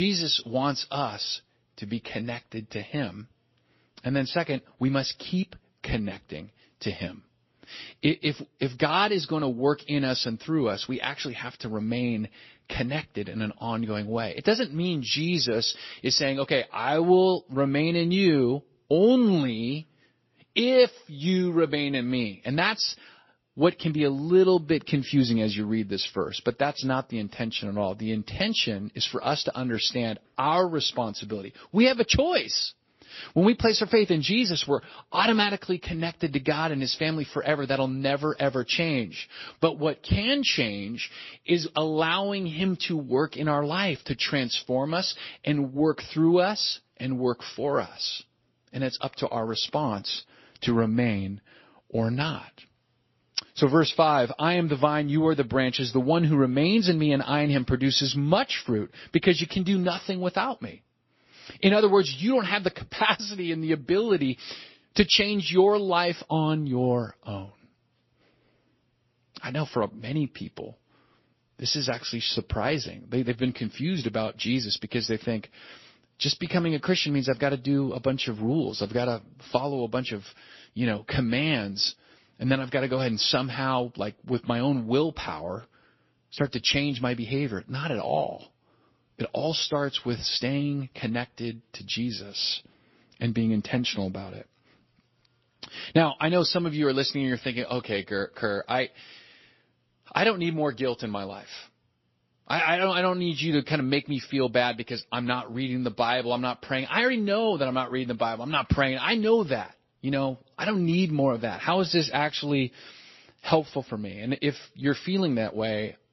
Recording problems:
garbled, watery; slightly; nothing above 5.5 kHz
abrupt cut into speech; at the start

